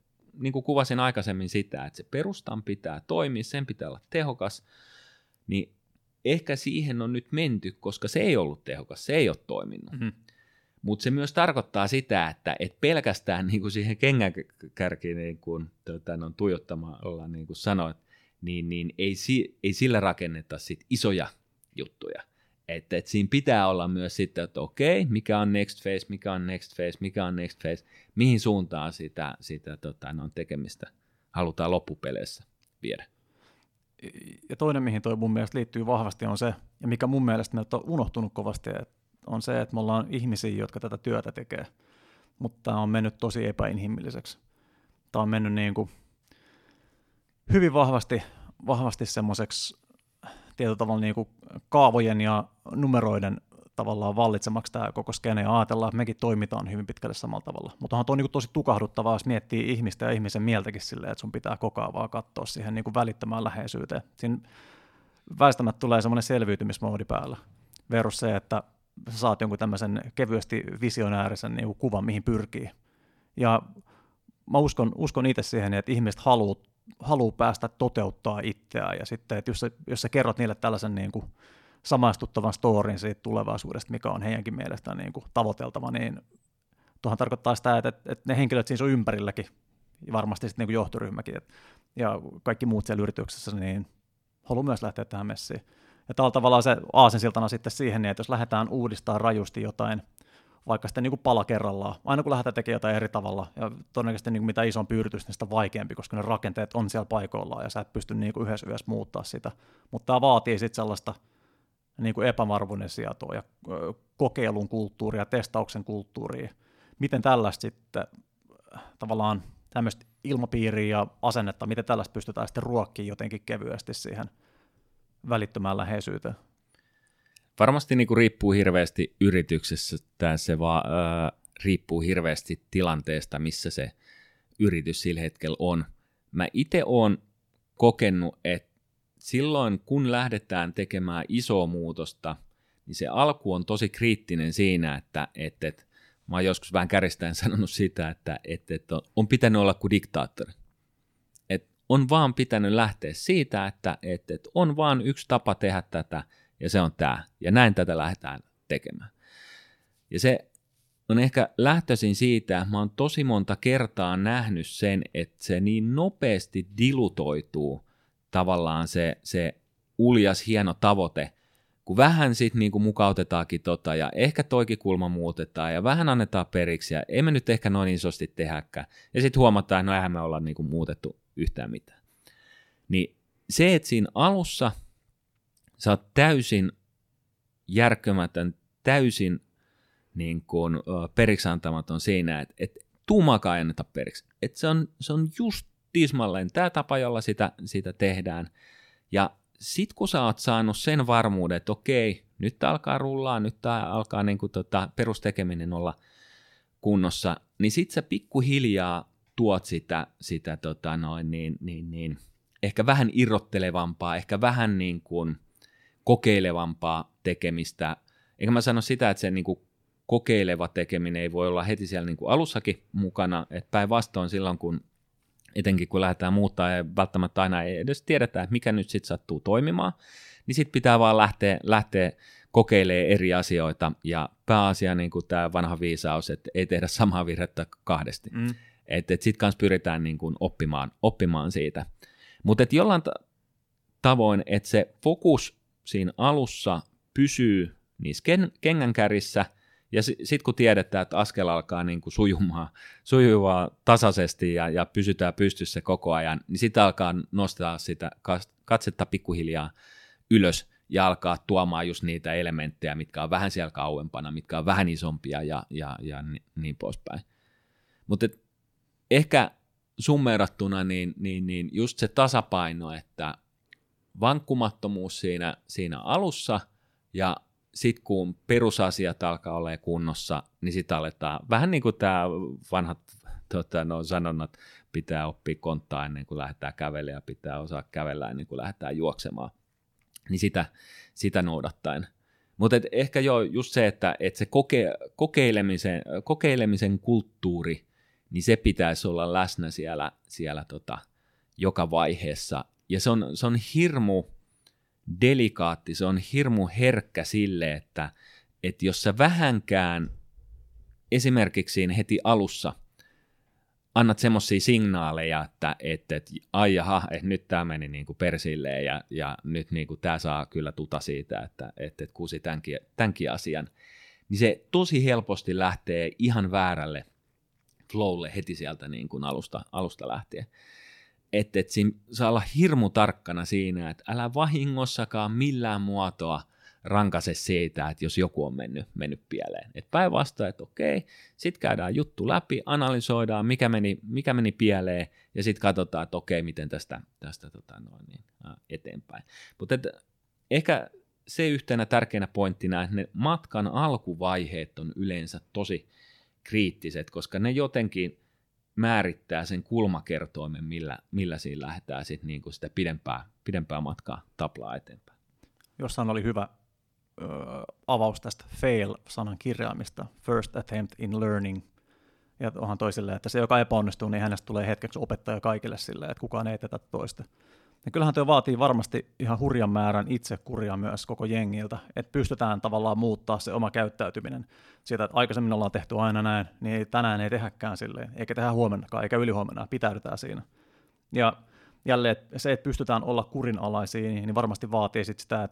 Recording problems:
none

